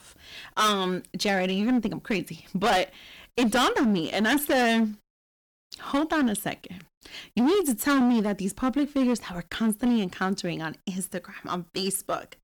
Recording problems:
distortion; heavy; 12% of the sound clipped

